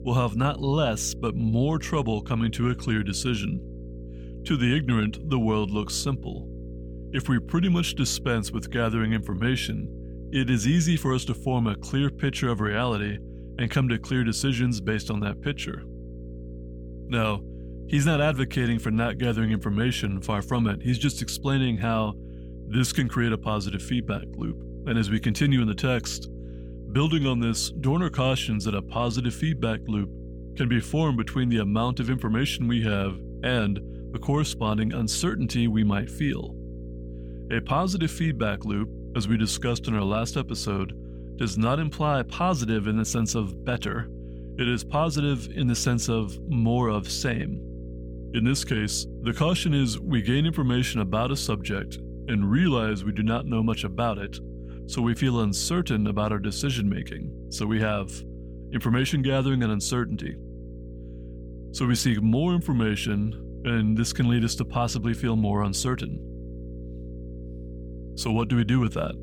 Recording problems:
electrical hum; noticeable; throughout; 60 Hz, 20 dB below the speech

